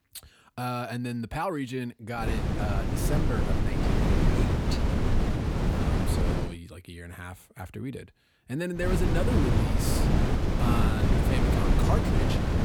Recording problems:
wind noise on the microphone; heavy; from 2 to 6.5 s and from 9 s on; 3 dB above the speech

